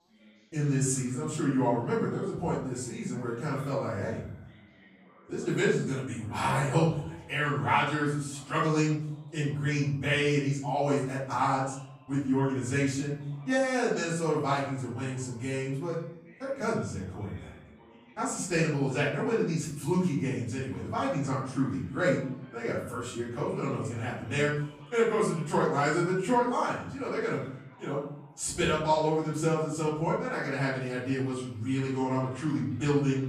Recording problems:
off-mic speech; far
room echo; noticeable; dies away in 0.6 s
background chatter; faint; throughout; 4 voices, 25 dB below the speech

